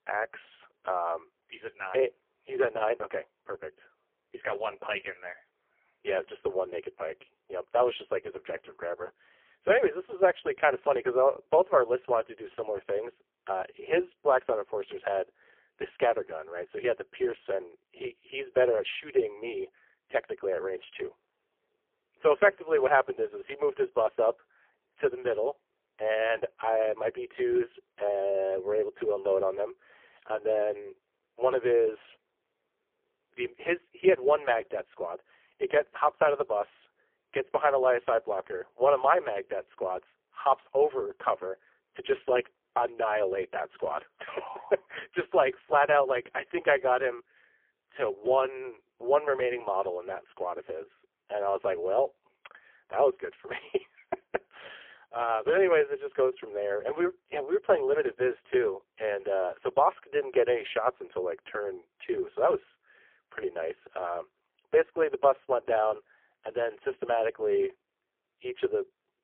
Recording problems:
phone-call audio; poor line; nothing above 3.5 kHz

